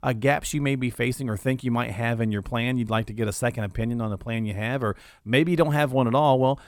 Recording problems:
none

